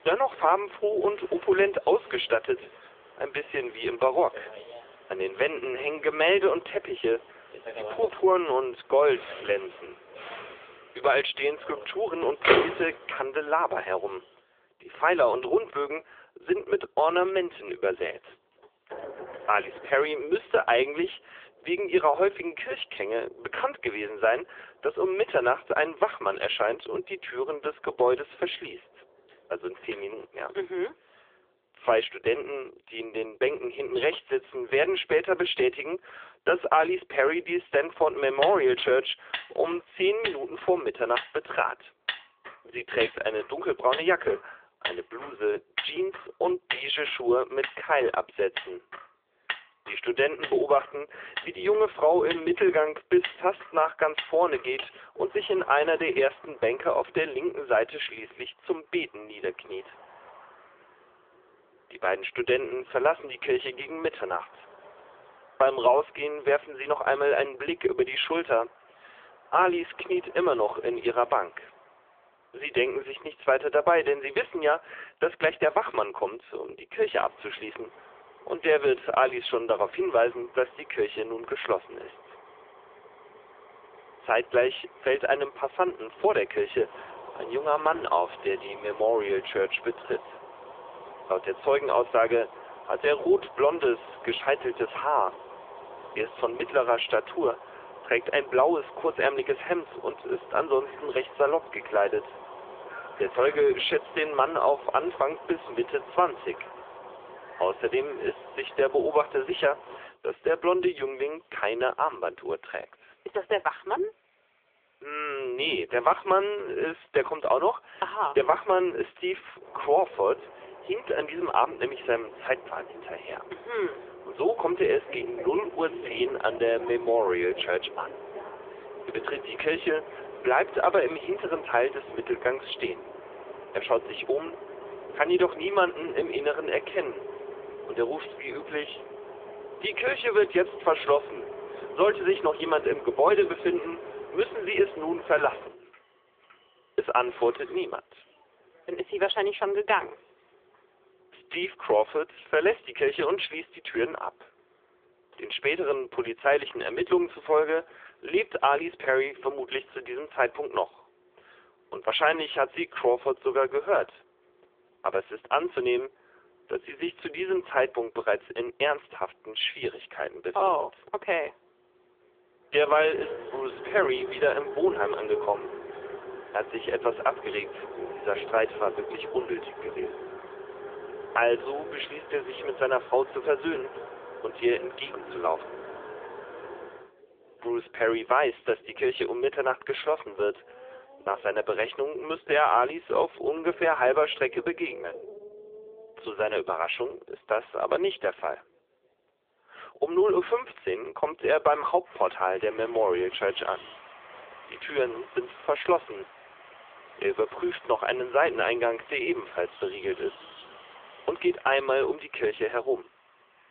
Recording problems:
phone-call audio; poor line; nothing above 3.5 kHz
traffic noise; noticeable; throughout; 15 dB below the speech

